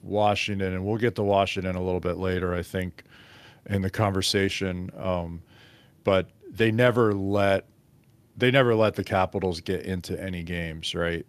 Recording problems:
none

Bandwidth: 14.5 kHz